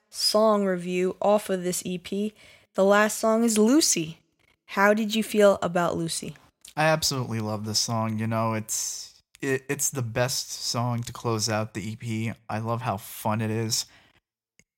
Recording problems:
none

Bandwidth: 16 kHz